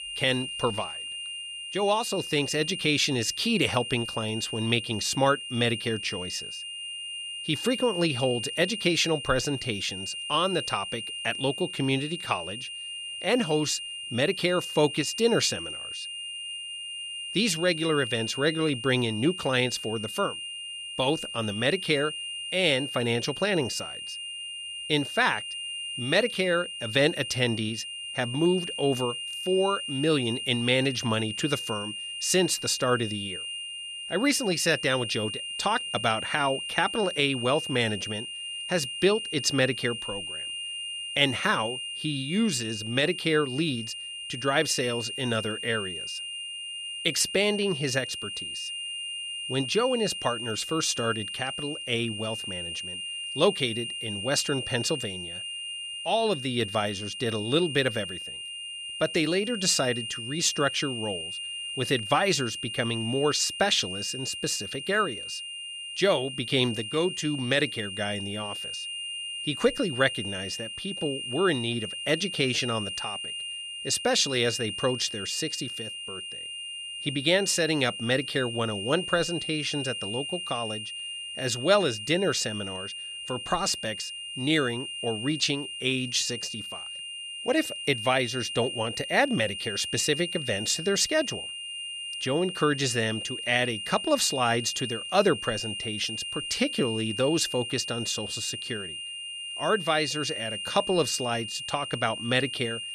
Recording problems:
high-pitched whine; loud; throughout; 3 kHz, 6 dB below the speech

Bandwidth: 13.5 kHz